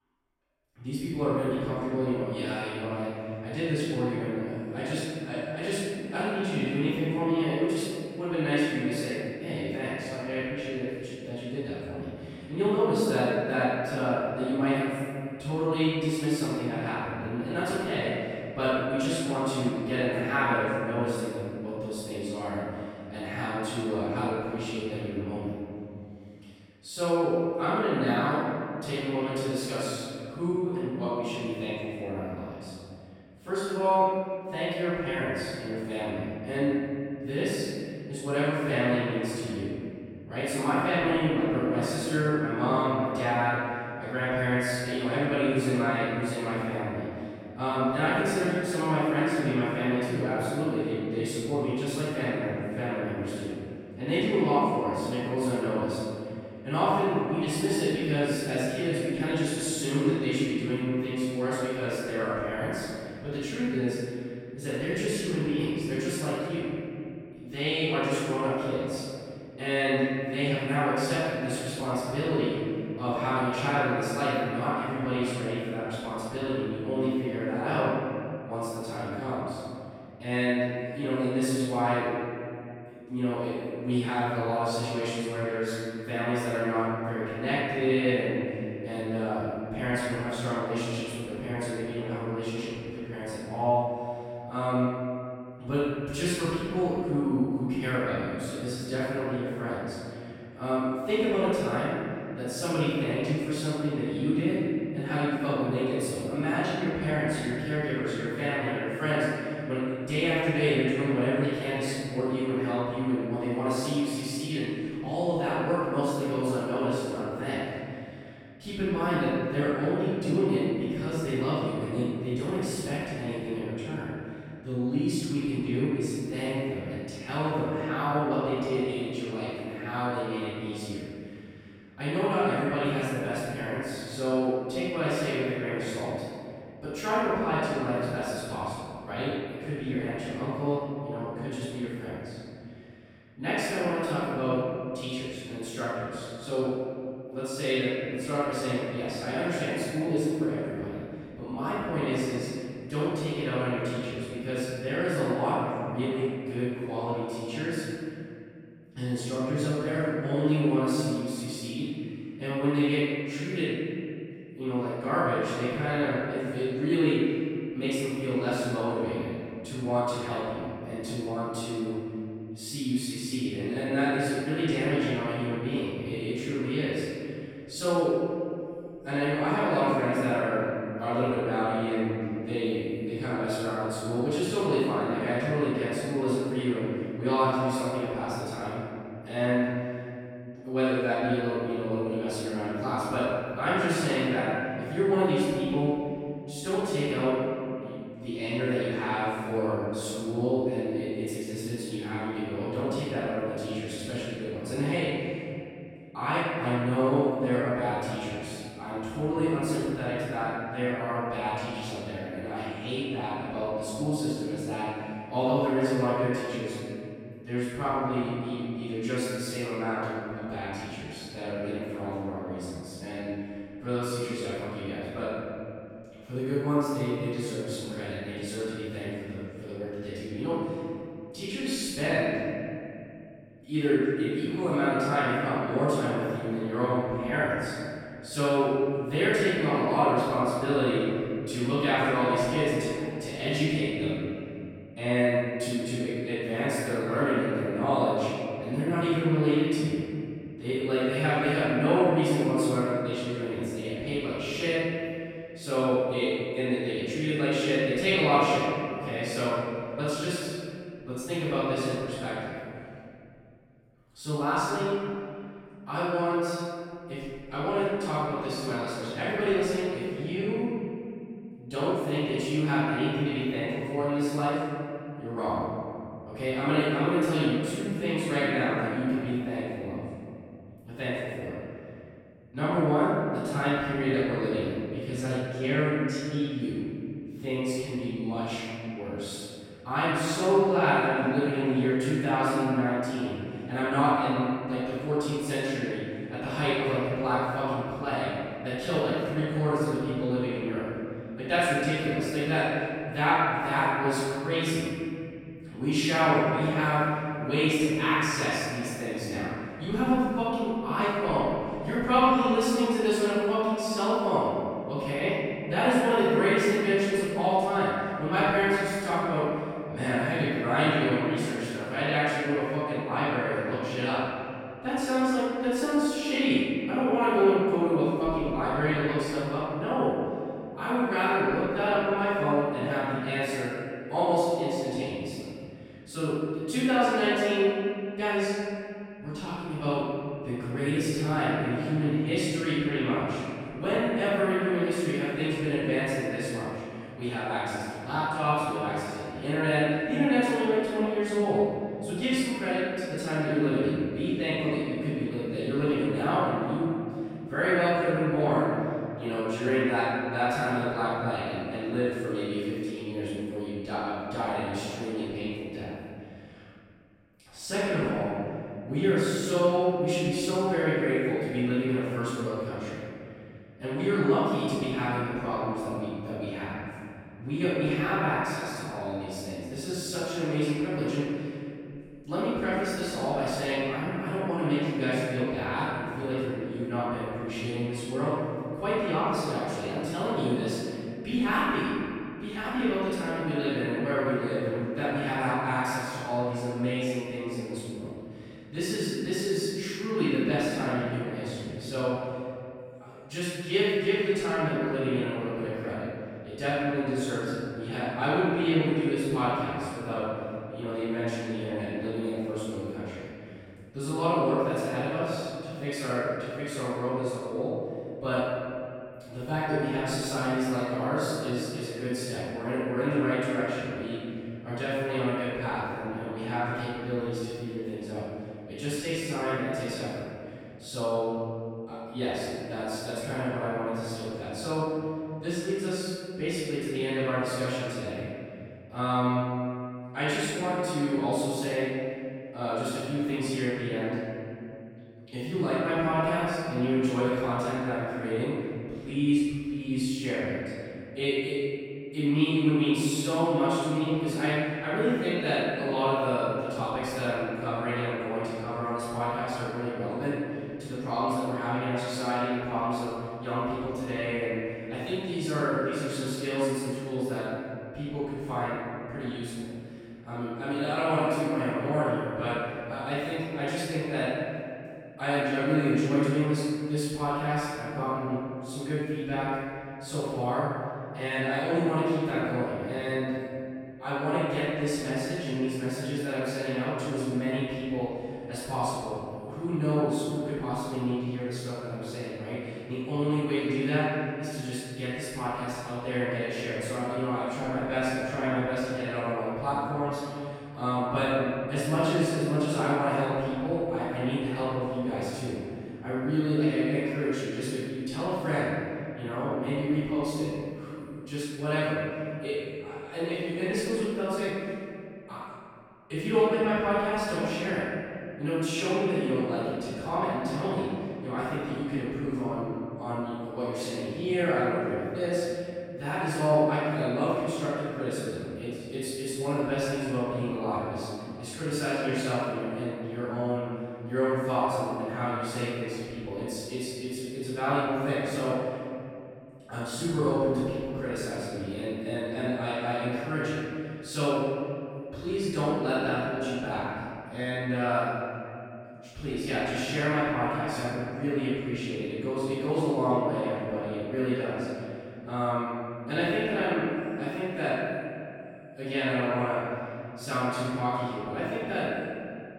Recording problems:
room echo; strong; dies away in 2.5 s
off-mic speech; far

